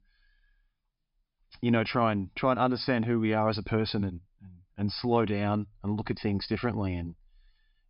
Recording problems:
high frequencies cut off; noticeable; nothing above 5.5 kHz

